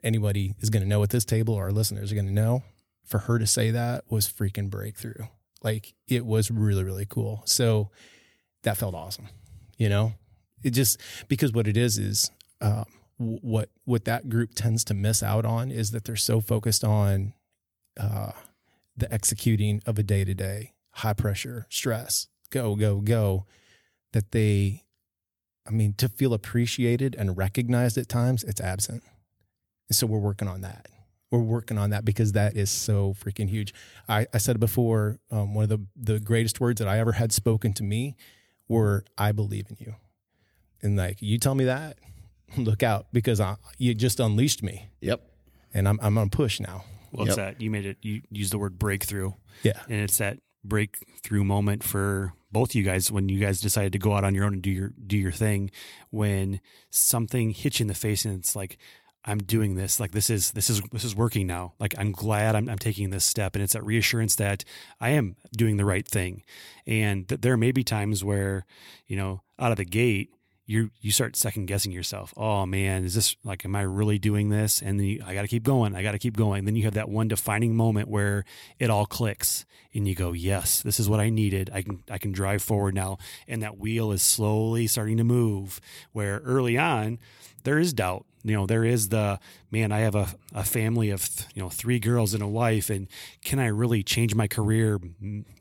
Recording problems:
none

